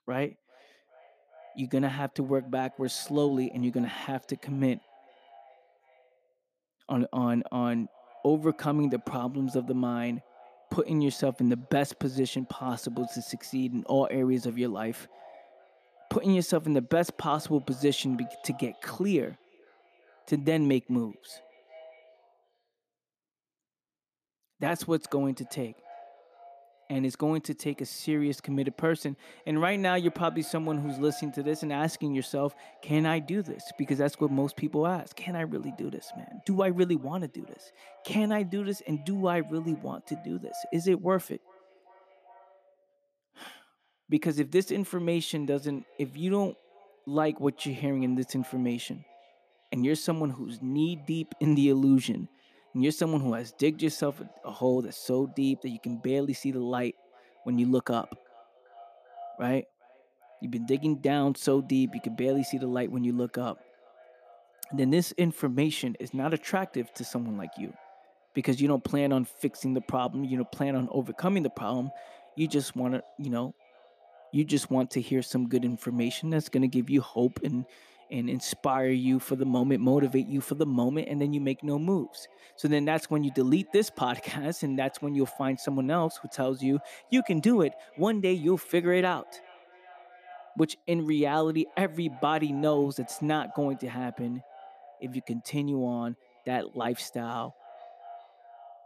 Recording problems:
echo of what is said; faint; throughout; 400 ms later, 25 dB below the speech

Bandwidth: 14.5 kHz